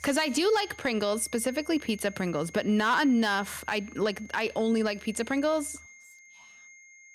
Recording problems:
high-pitched whine; faint; throughout; 2 kHz, 20 dB below the speech

